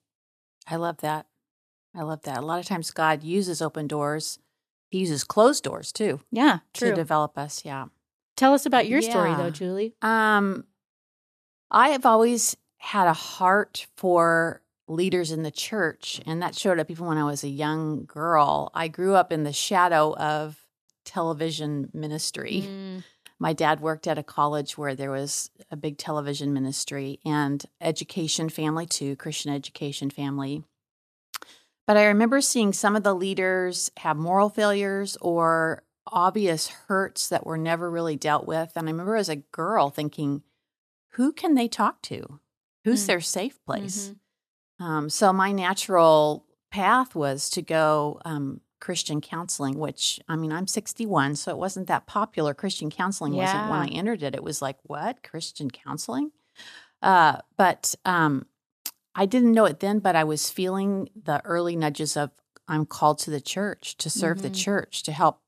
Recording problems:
none

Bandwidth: 14.5 kHz